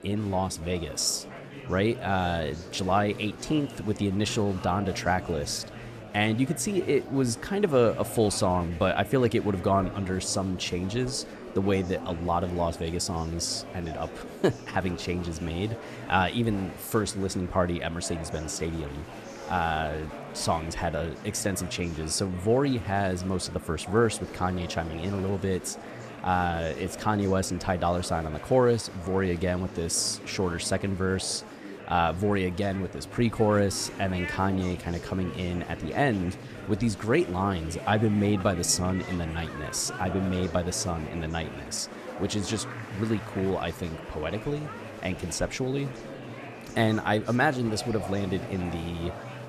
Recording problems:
murmuring crowd; noticeable; throughout; 10 dB below the speech

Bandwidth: 14 kHz